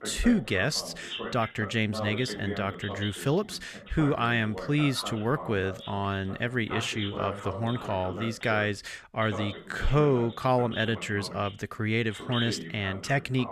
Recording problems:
voice in the background; noticeable; throughout; 10 dB below the speech

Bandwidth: 14.5 kHz